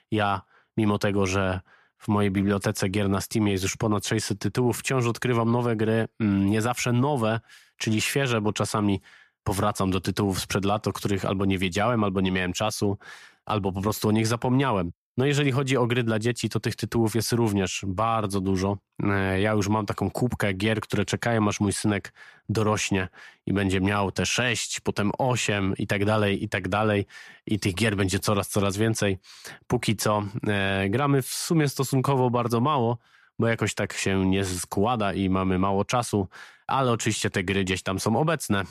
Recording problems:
none

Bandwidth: 14.5 kHz